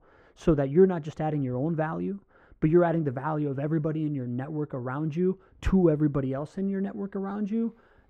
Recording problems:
muffled; very; fading above 3 kHz

